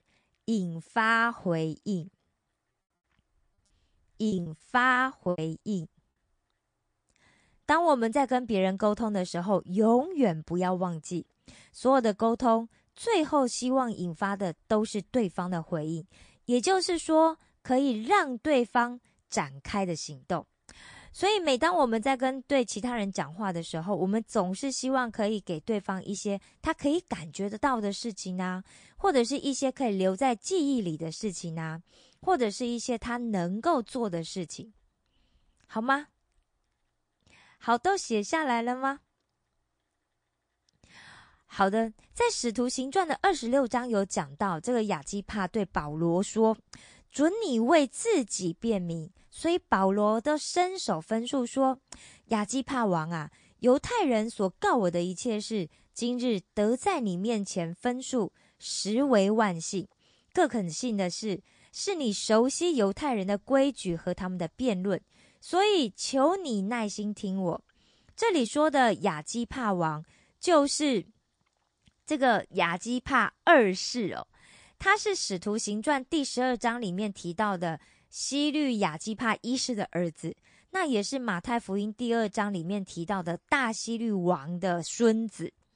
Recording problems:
garbled, watery; slightly; nothing above 9 kHz
choppy; very; from 4.5 to 6 s; 19% of the speech affected

